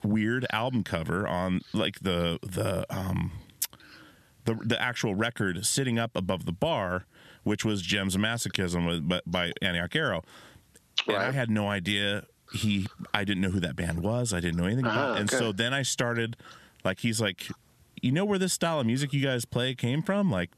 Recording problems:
squashed, flat; somewhat

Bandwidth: 13.5 kHz